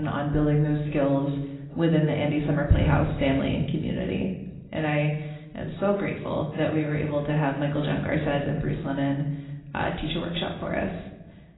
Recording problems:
garbled, watery; badly; nothing above 4 kHz
room echo; slight; dies away in 0.7 s
off-mic speech; somewhat distant
abrupt cut into speech; at the start

